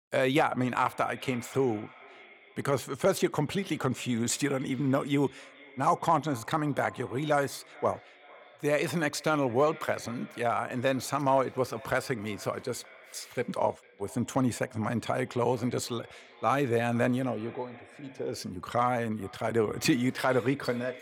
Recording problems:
echo of what is said; faint; throughout; 450 ms later, 20 dB below the speech

